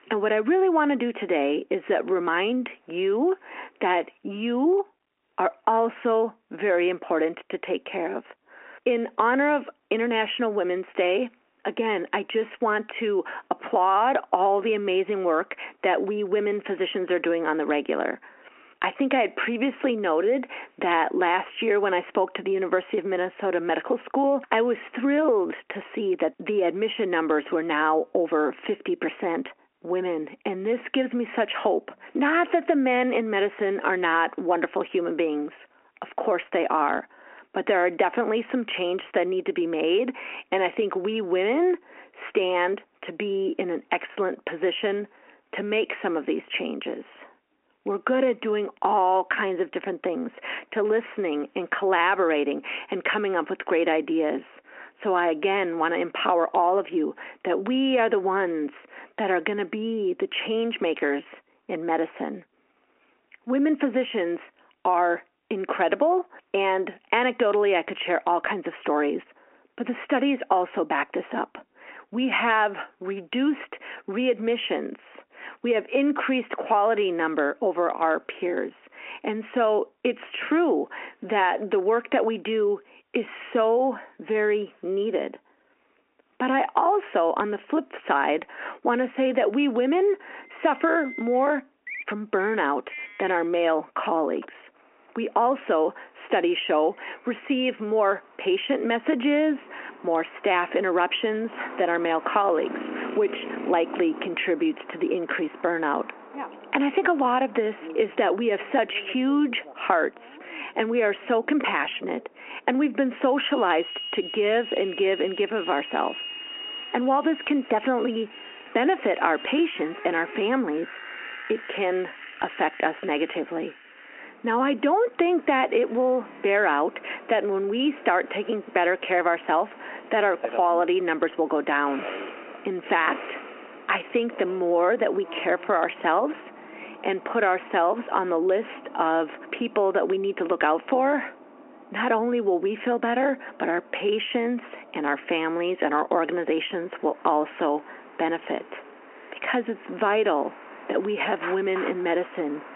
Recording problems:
squashed, flat; heavily, background pumping
phone-call audio; nothing above 3 kHz
traffic noise; noticeable; from 1:31 on; 15 dB below the speech

